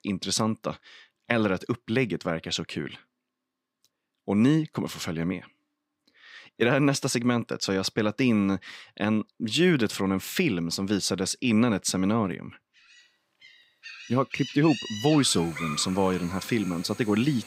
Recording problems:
animal sounds; noticeable; from 13 s on; 10 dB below the speech

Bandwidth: 15.5 kHz